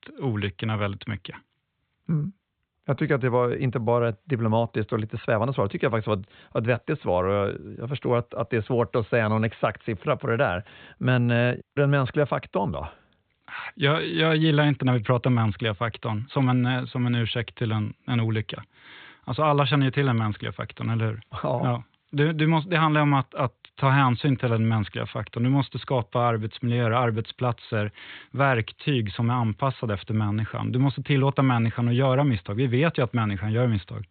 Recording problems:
high frequencies cut off; severe; nothing above 4 kHz

